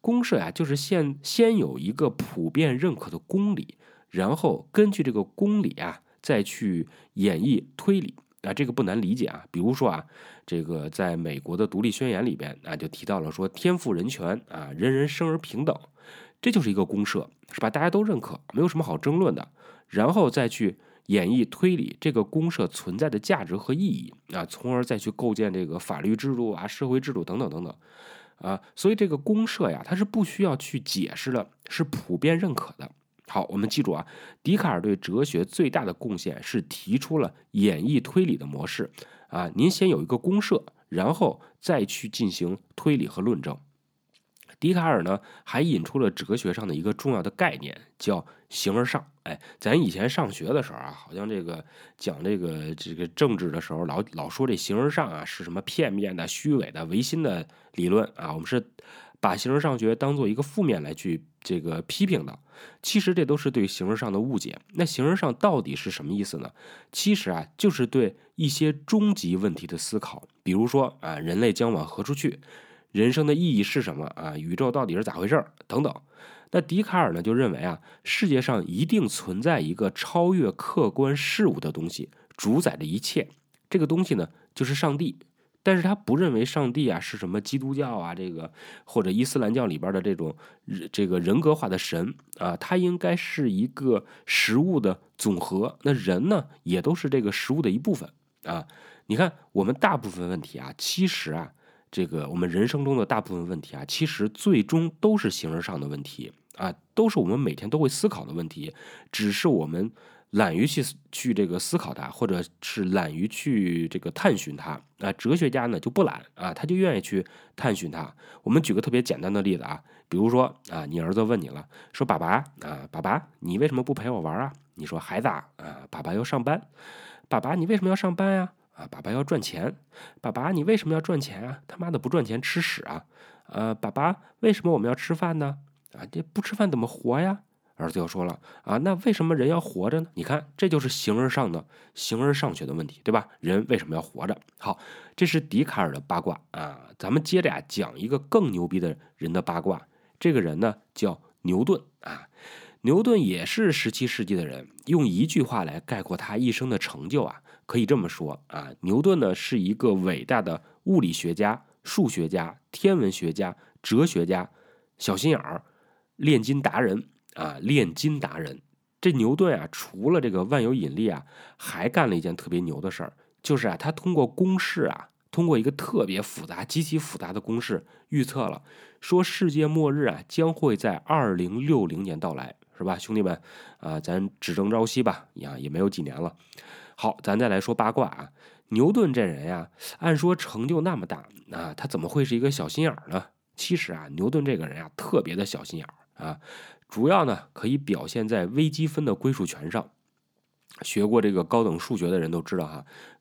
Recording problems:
none

